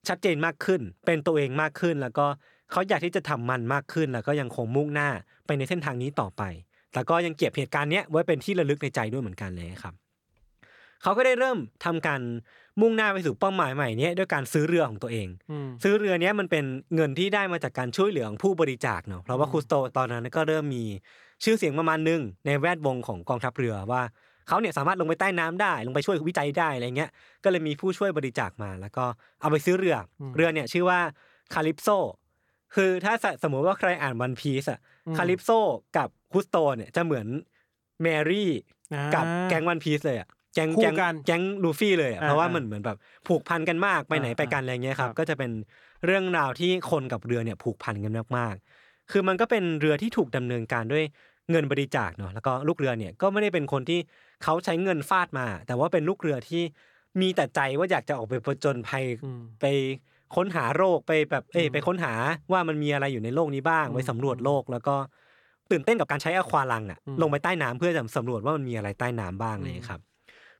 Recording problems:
uneven, jittery; strongly; from 5.5 s to 1:08

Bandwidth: 18 kHz